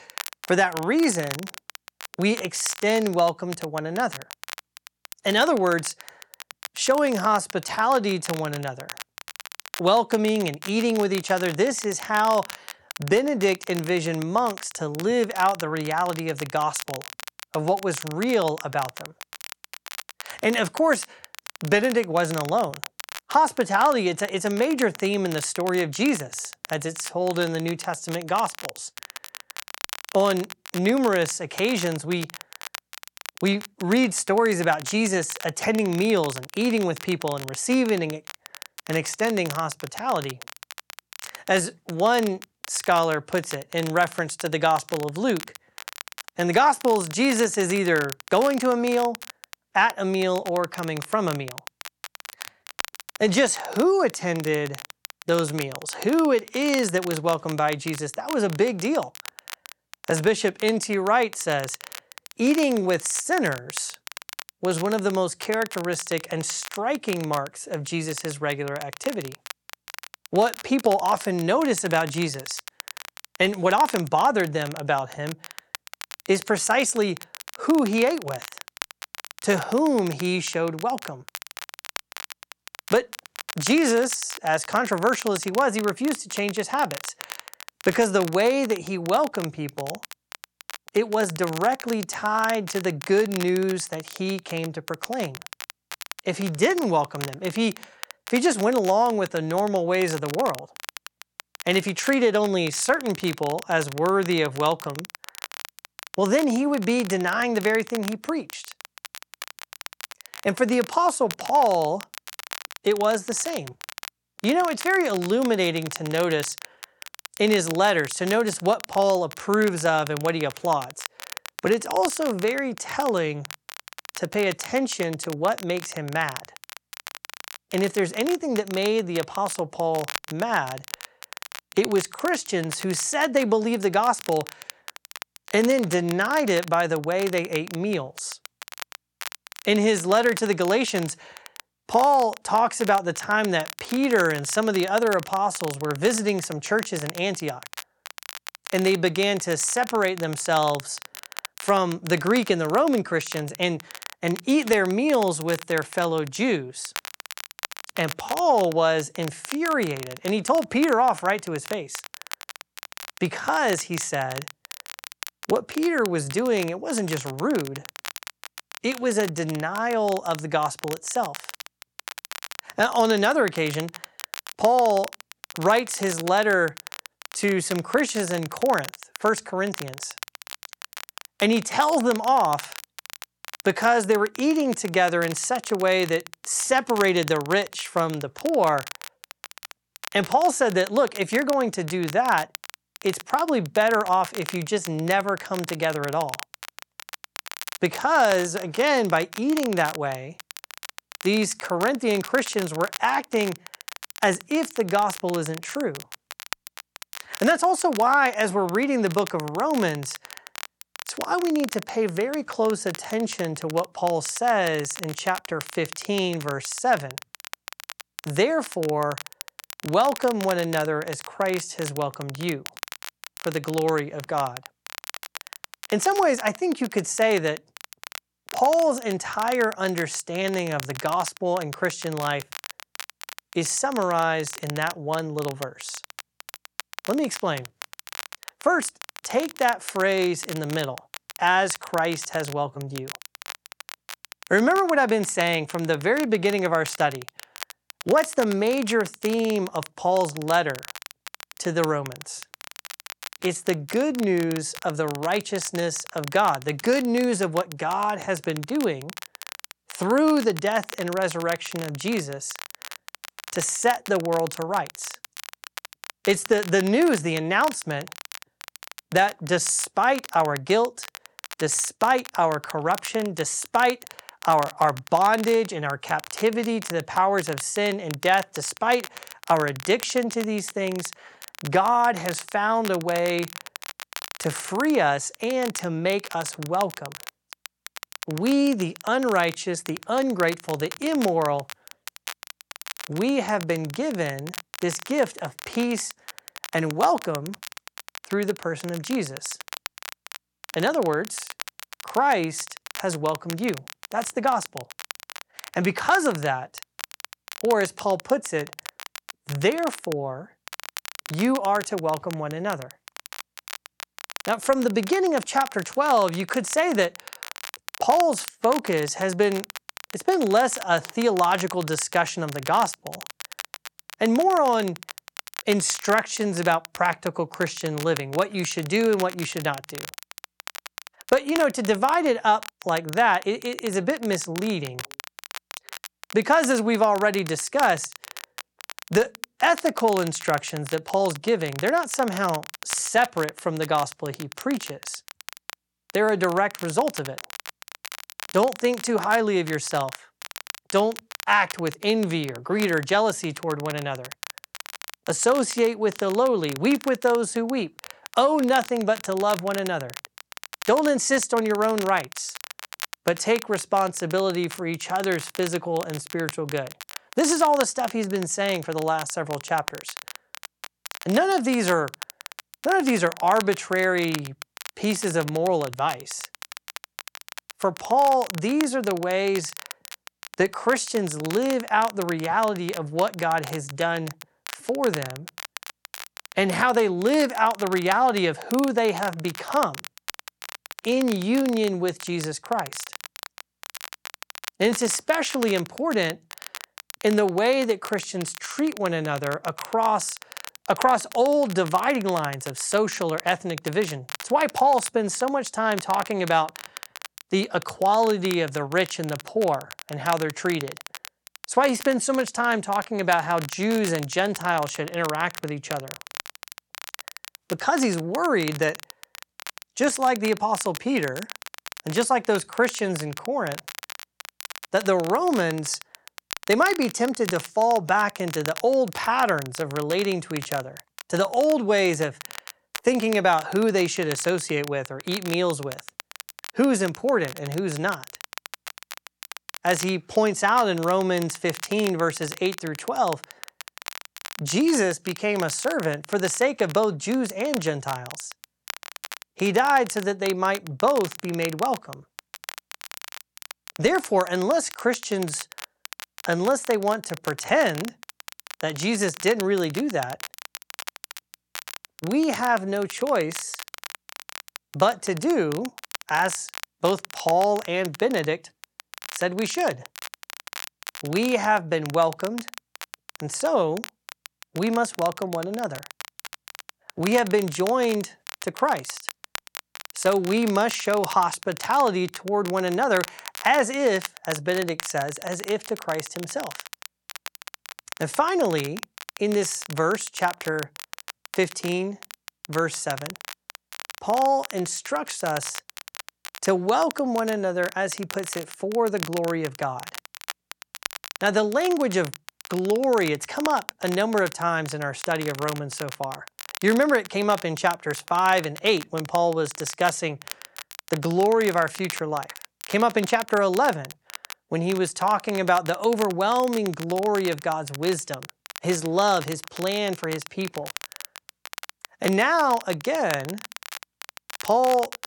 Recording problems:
crackle, like an old record; noticeable; 15 dB below the speech

